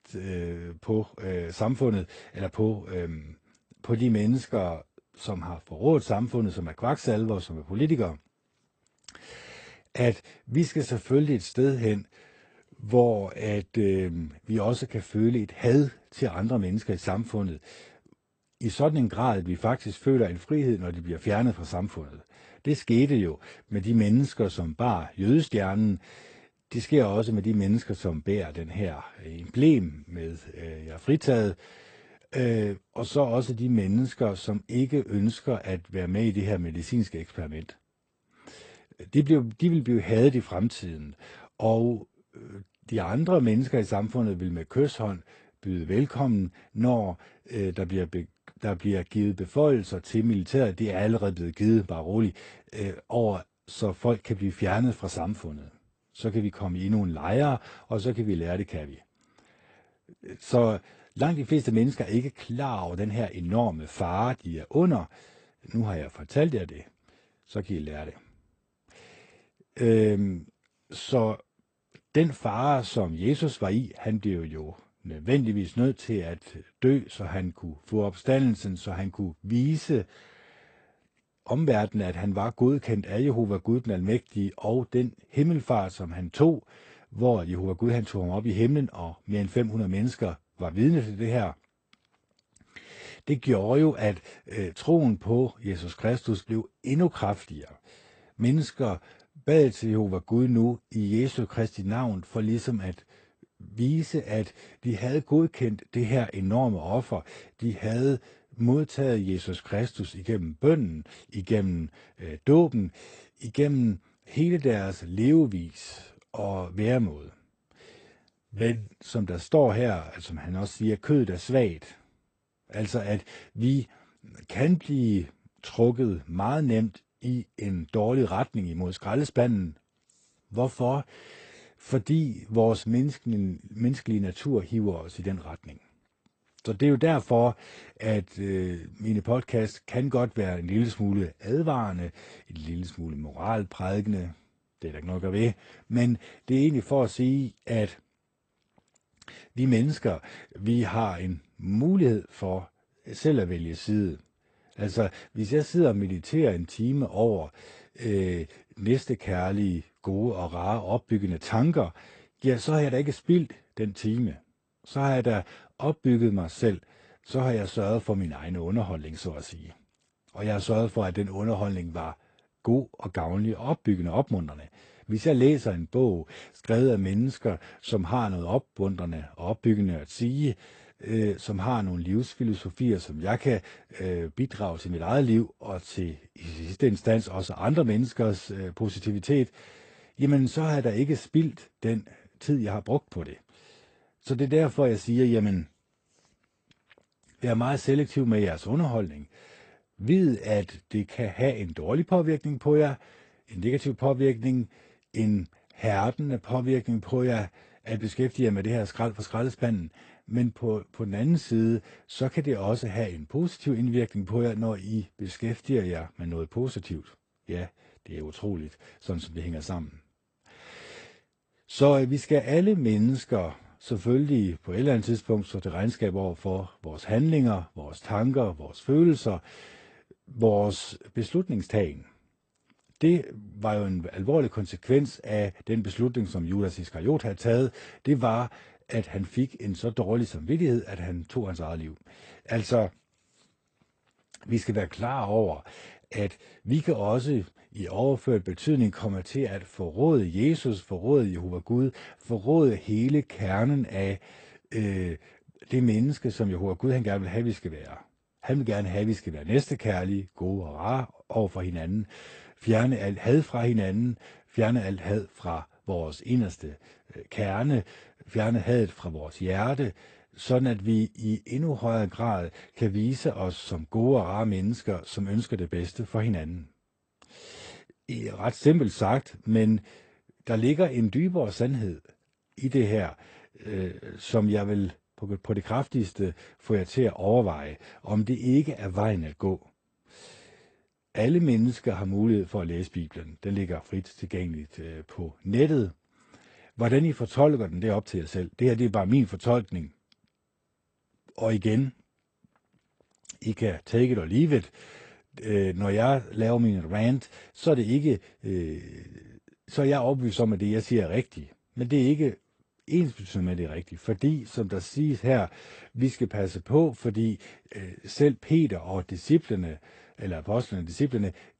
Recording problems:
garbled, watery; slightly; nothing above 8.5 kHz

